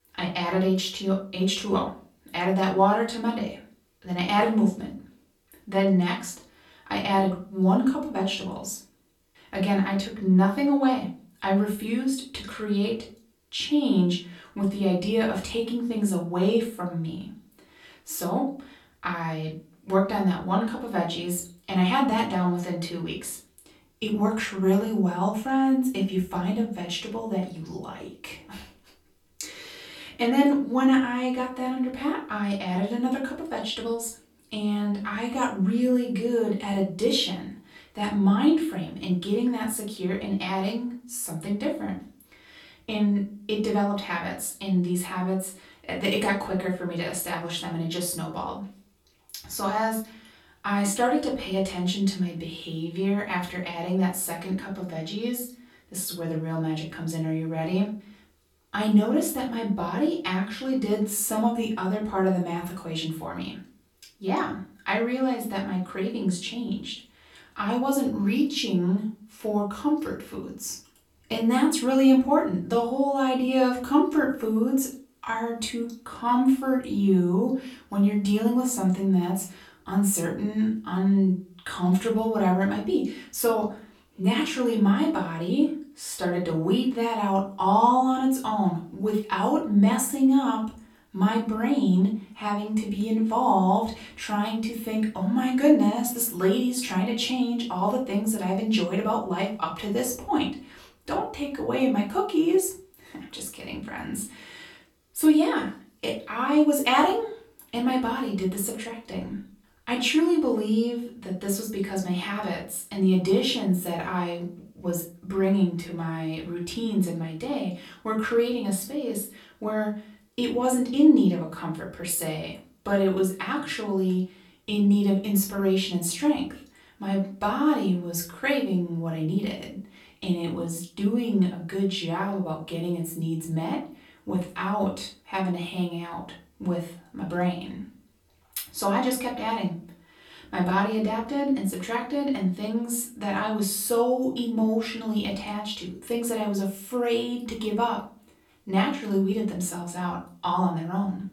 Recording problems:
off-mic speech; far
room echo; slight; dies away in 0.3 s

